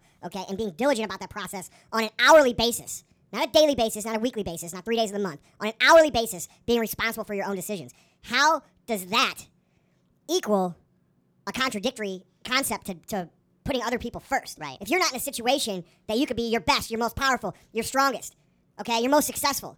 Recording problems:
wrong speed and pitch; too fast and too high; 1.5 times normal speed

